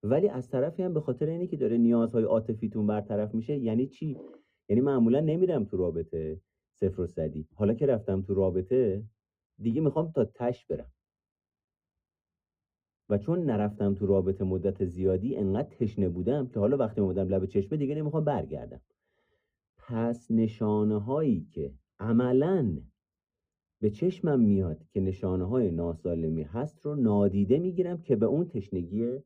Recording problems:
muffled; very; fading above 1 kHz

